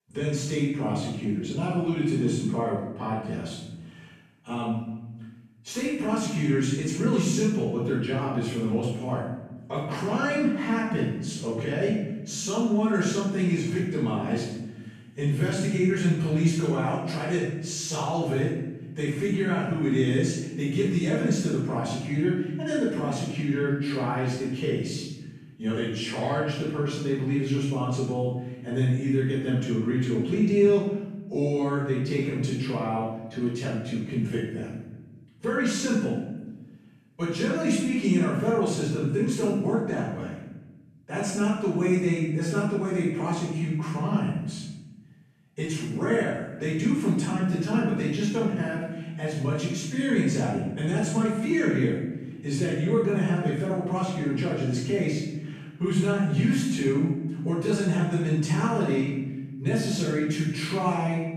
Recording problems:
room echo; strong; dies away in 1 s
off-mic speech; far

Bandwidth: 14.5 kHz